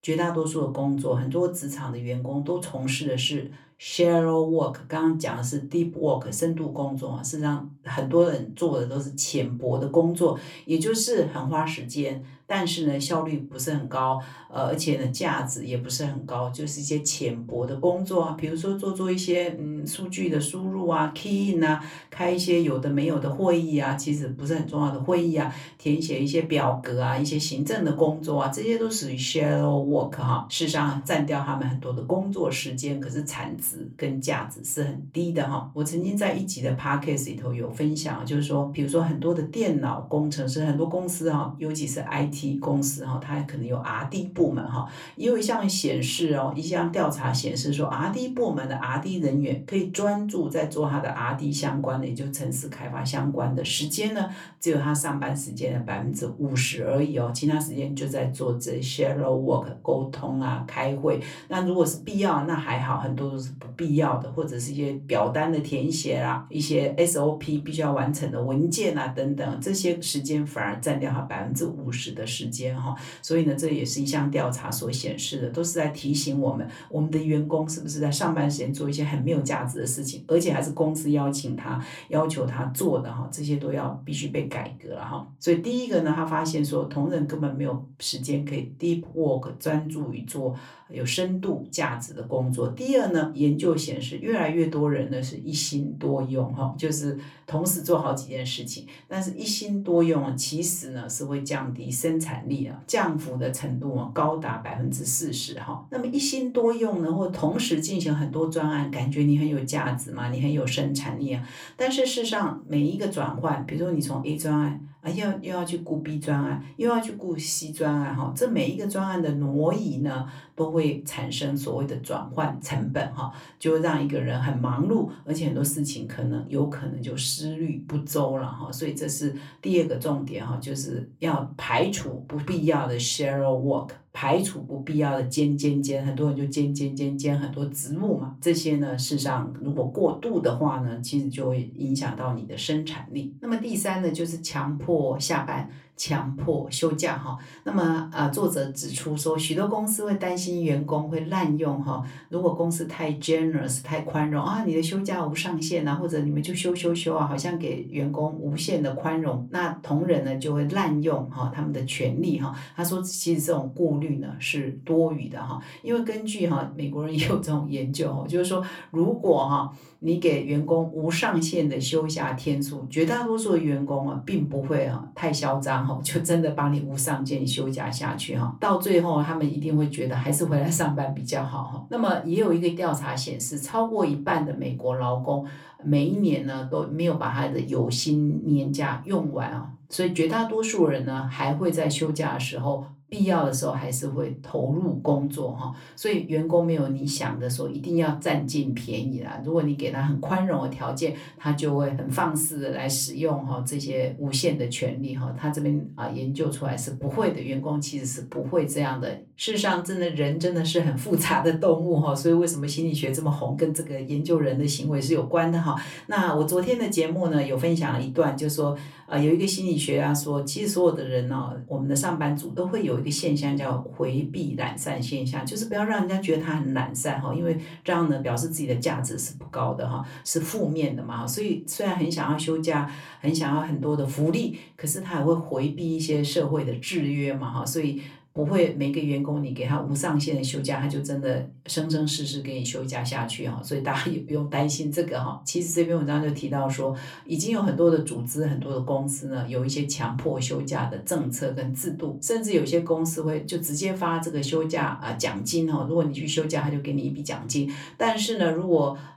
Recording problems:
off-mic speech; far
room echo; very slight; dies away in 0.2 s

